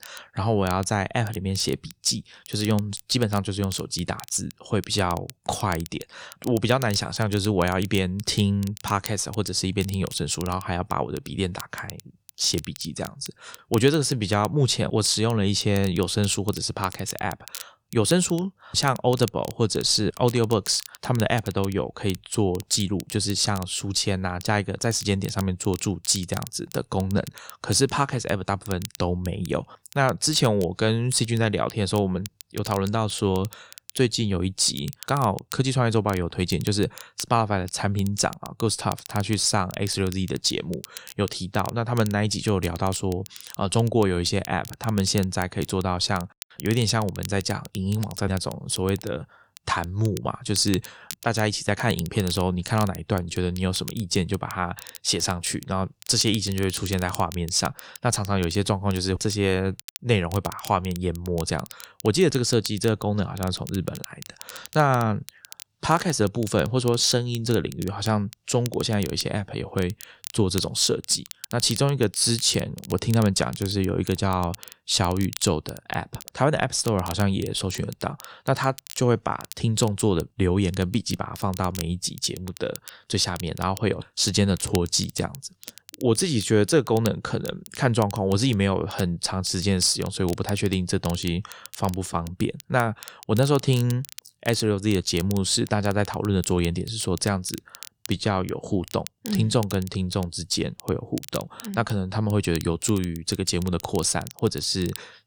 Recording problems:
crackle, like an old record; noticeable; 15 dB below the speech

